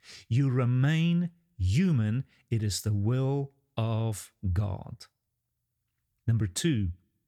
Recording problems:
none

